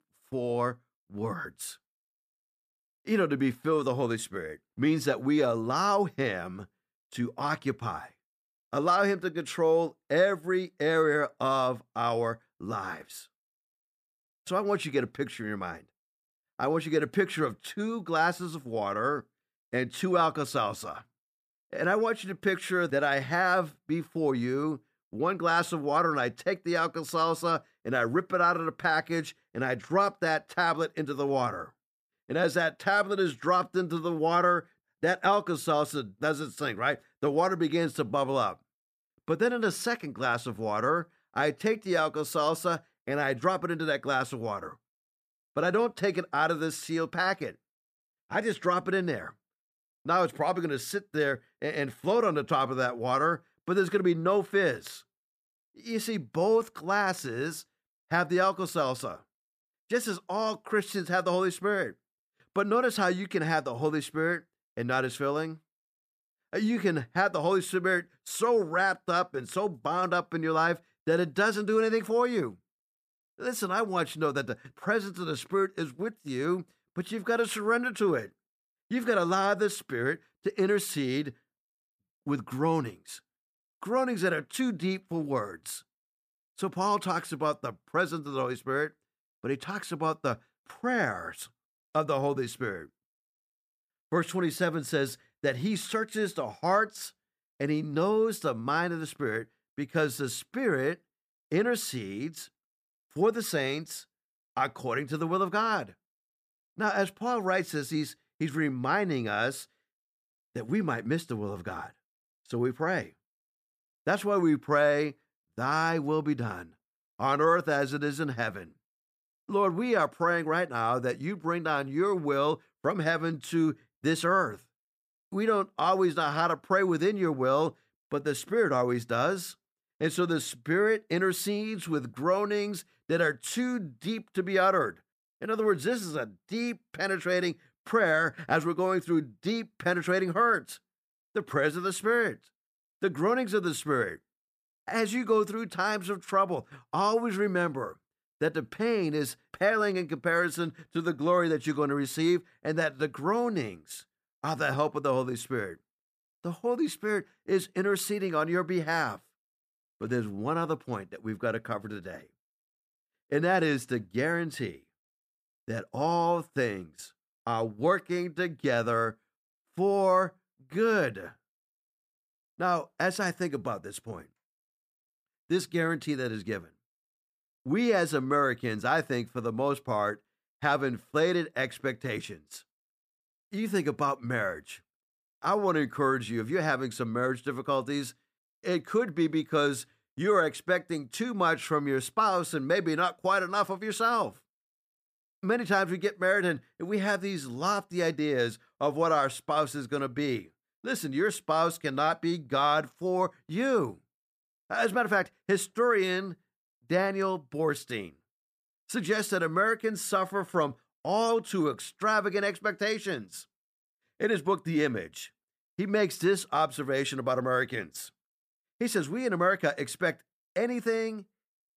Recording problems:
none

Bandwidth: 14.5 kHz